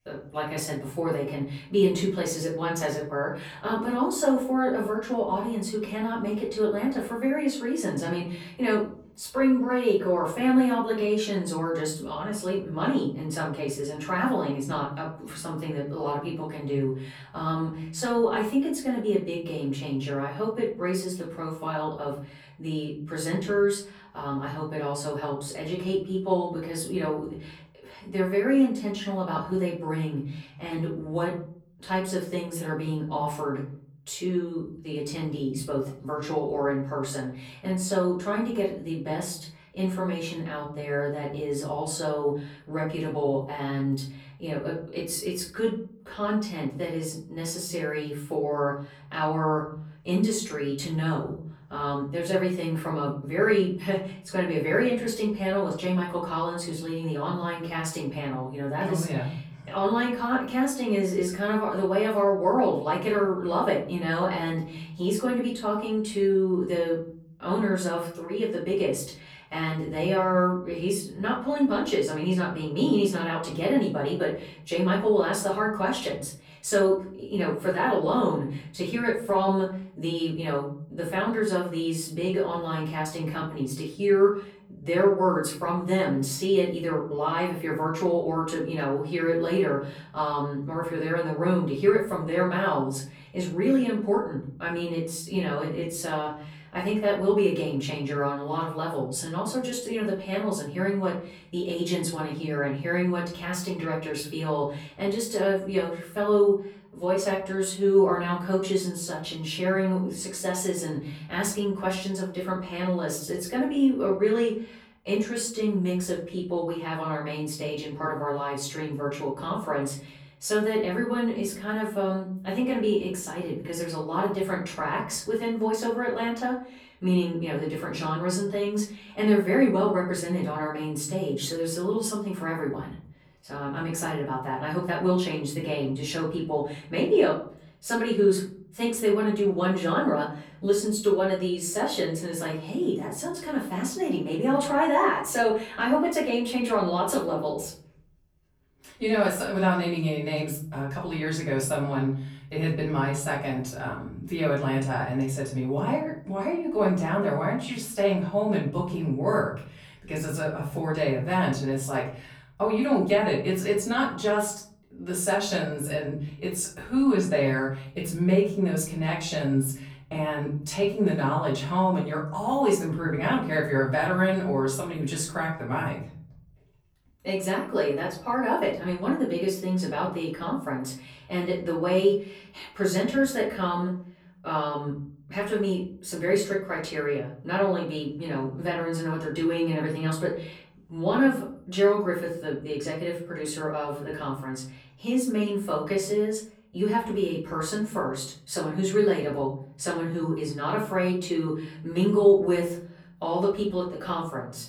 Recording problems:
off-mic speech; far
room echo; slight; dies away in 0.7 s

